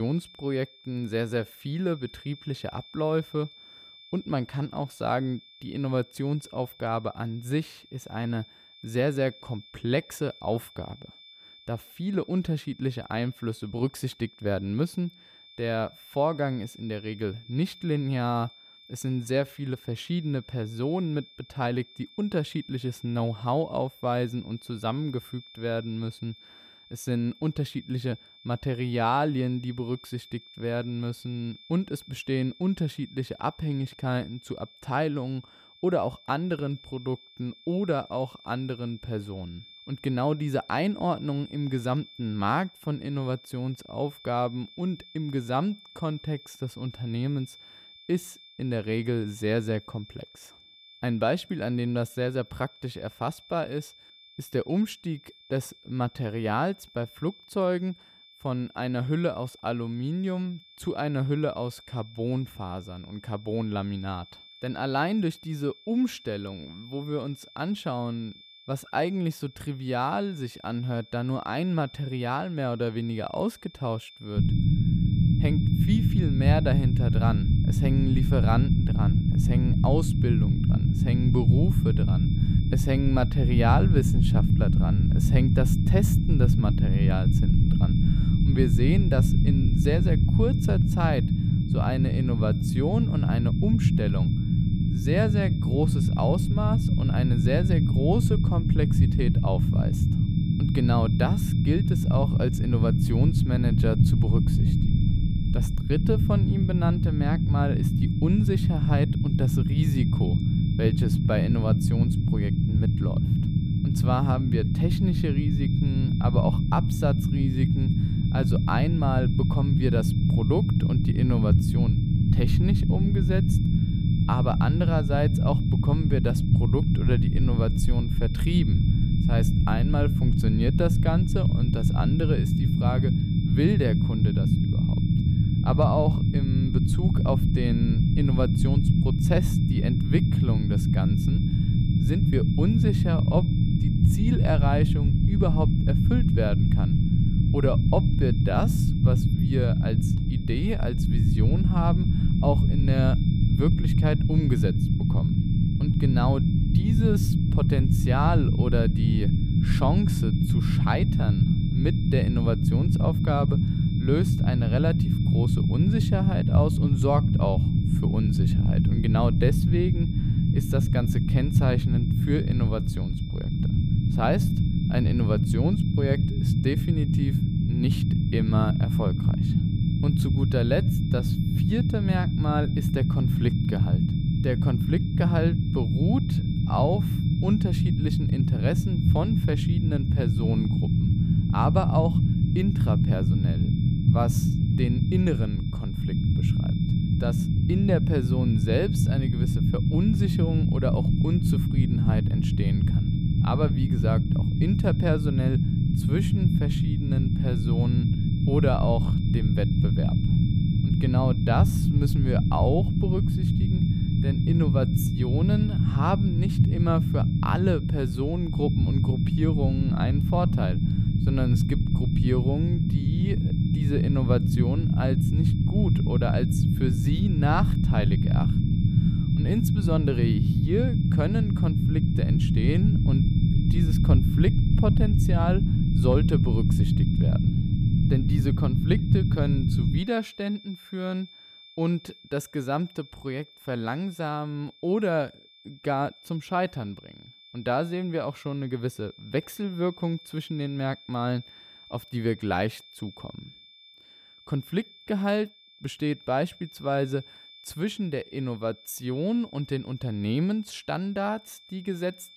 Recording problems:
low rumble; loud; from 1:14 to 4:00; 2 dB below the speech
high-pitched whine; noticeable; throughout; 3.5 kHz, 20 dB below the speech
abrupt cut into speech; at the start

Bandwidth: 15 kHz